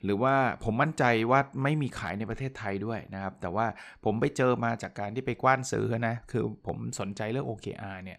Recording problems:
none

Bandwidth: 14.5 kHz